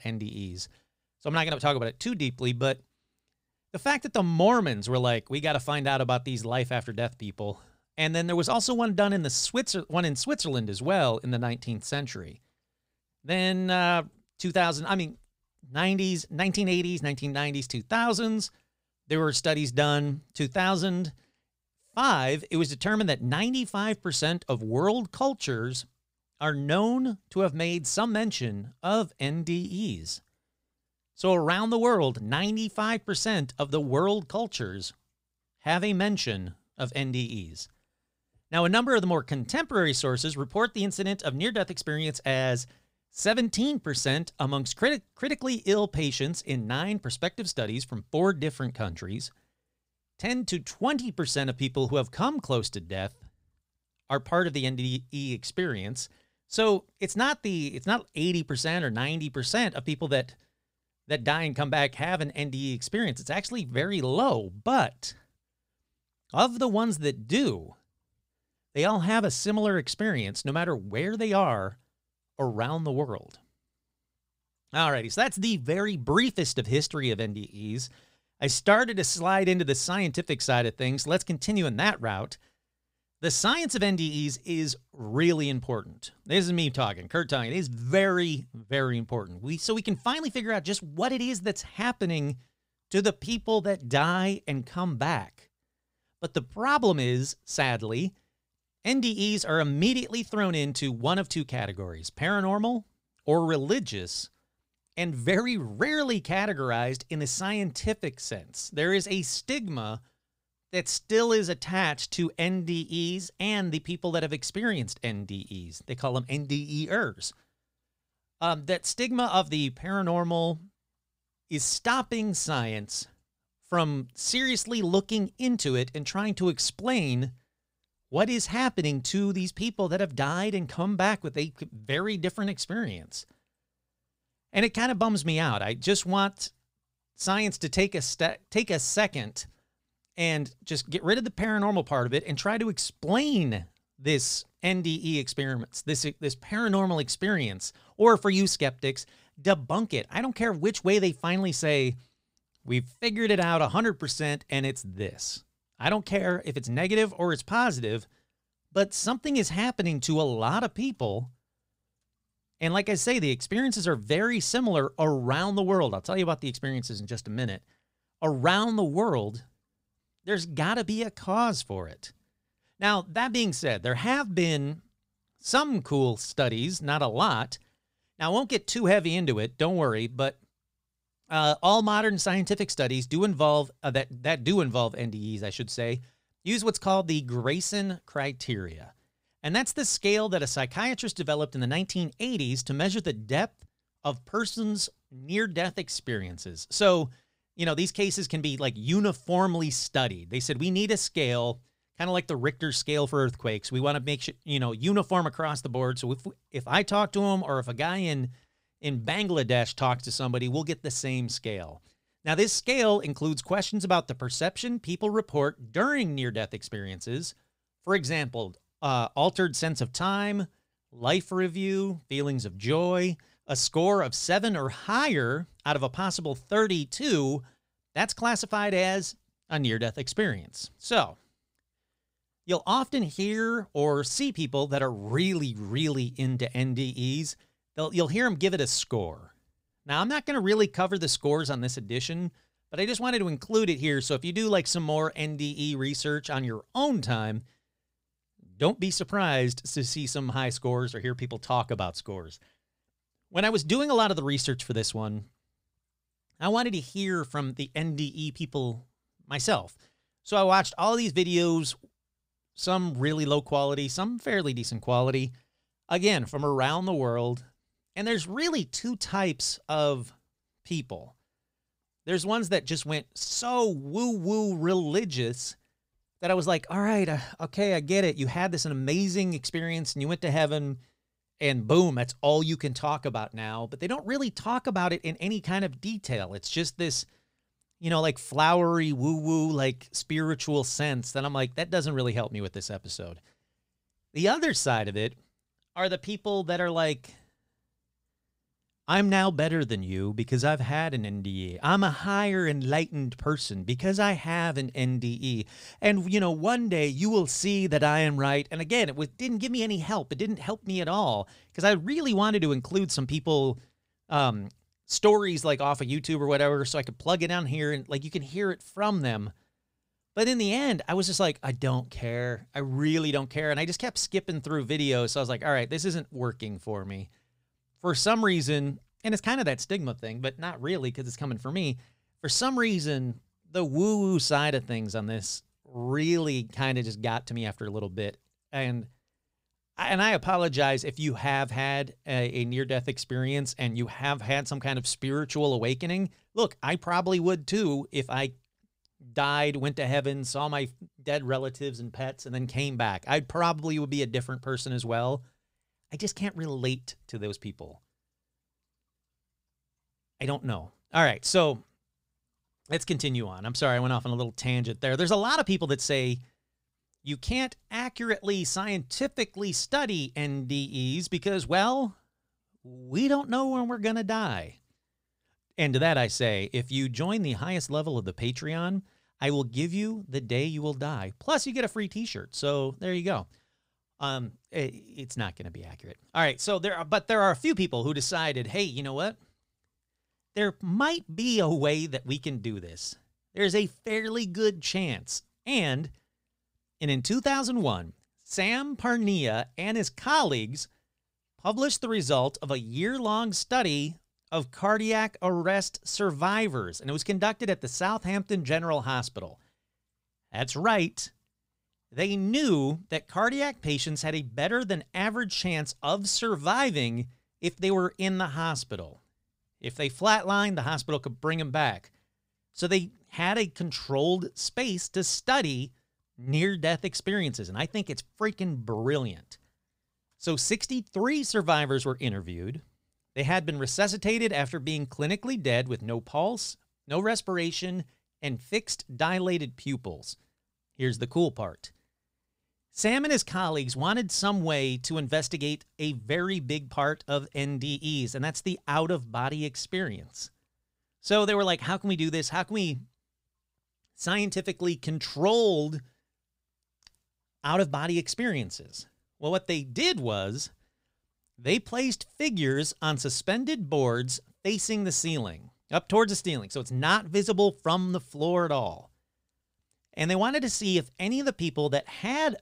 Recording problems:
none

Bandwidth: 15.5 kHz